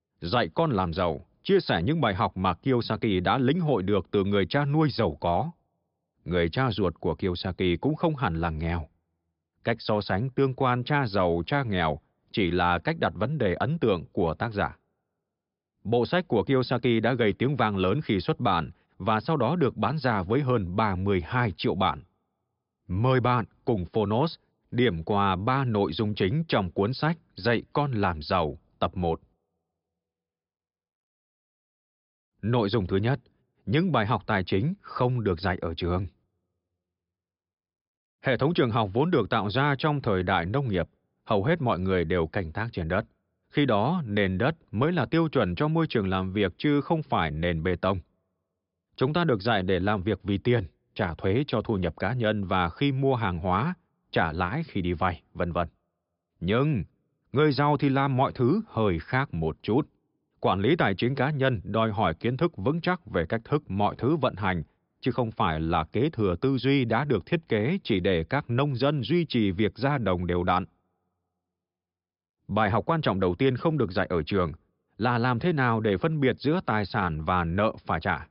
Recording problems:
high frequencies cut off; noticeable; nothing above 5.5 kHz

